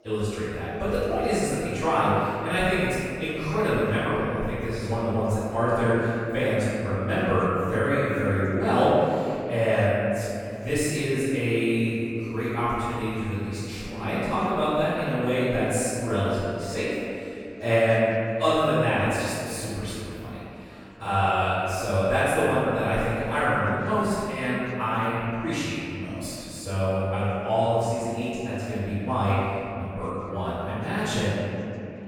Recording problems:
room echo; strong; dies away in 2.6 s
off-mic speech; far
chatter from many people; faint; throughout; 30 dB below the speech

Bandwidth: 18 kHz